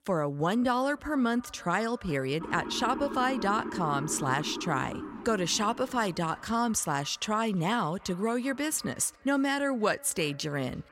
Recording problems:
echo of what is said; faint; throughout; 350 ms later, 25 dB below the speech
siren; noticeable; from 2.5 to 6 s; peak 7 dB below the speech

